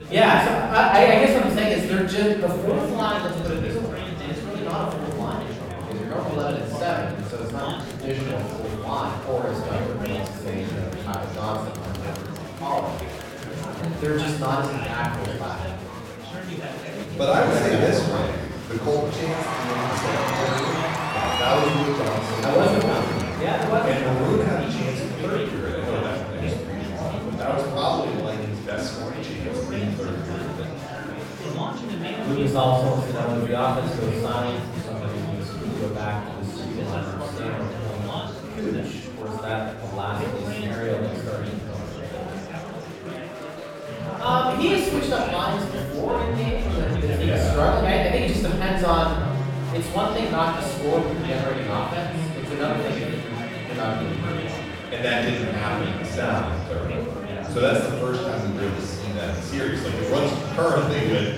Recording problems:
room echo; strong; dies away in 1 s
off-mic speech; far
background music; loud; from 40 s on; 8 dB below the speech
chatter from many people; loud; throughout; 6 dB below the speech

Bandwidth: 16.5 kHz